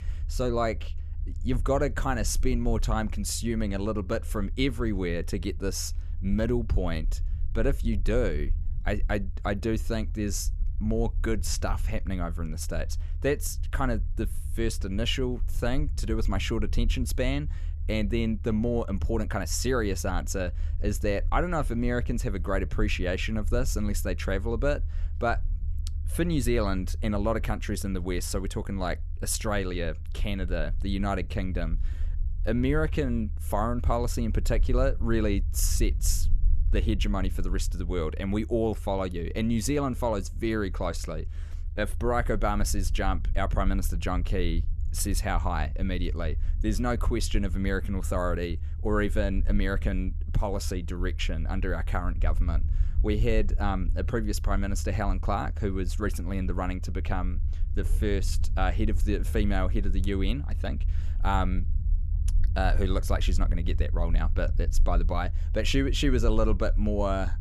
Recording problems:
low rumble; faint; throughout; 20 dB below the speech

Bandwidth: 13.5 kHz